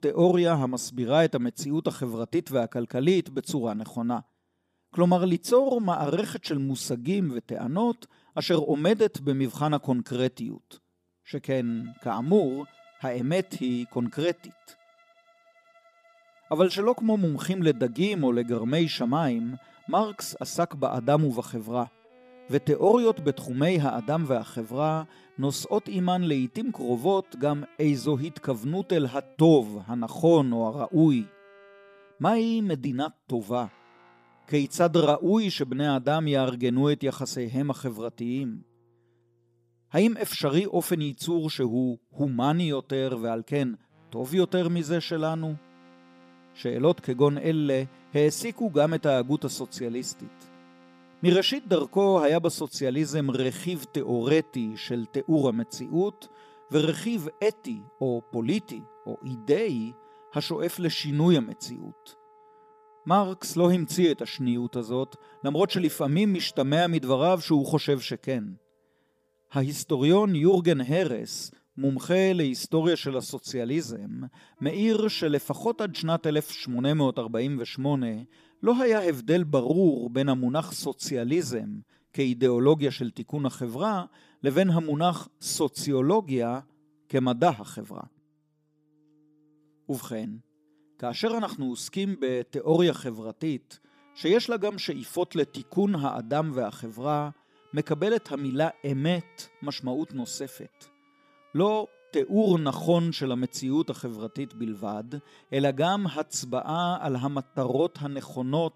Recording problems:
background music; faint; throughout; 30 dB below the speech

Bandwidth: 15 kHz